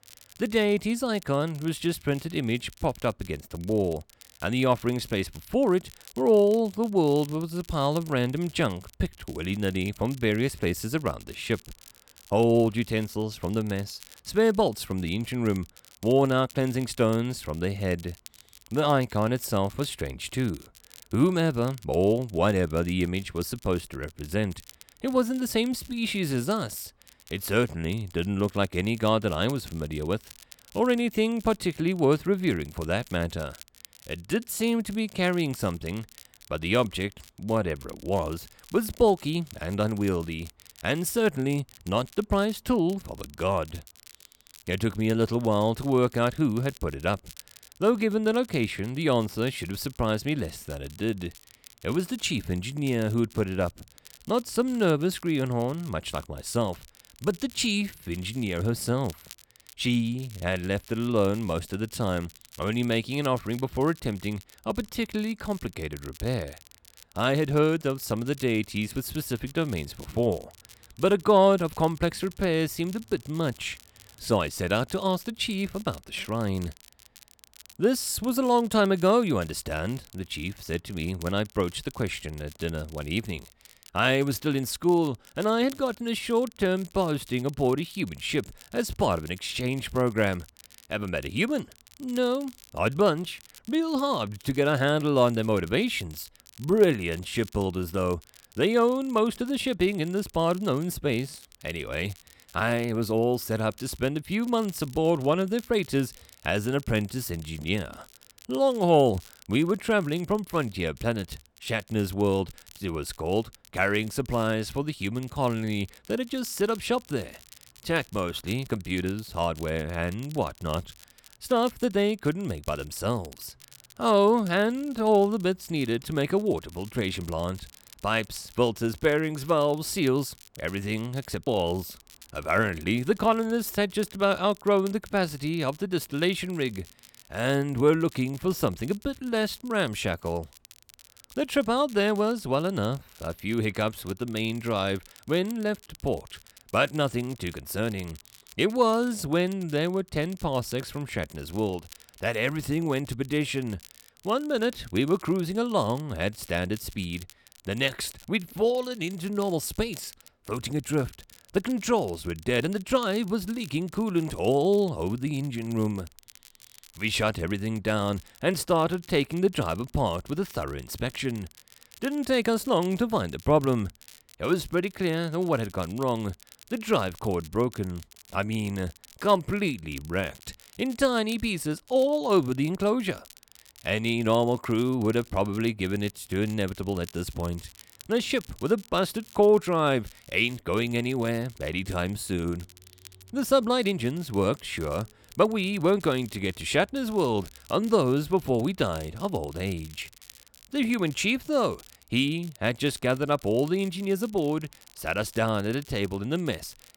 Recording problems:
crackle, like an old record; faint; 25 dB below the speech

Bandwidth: 18 kHz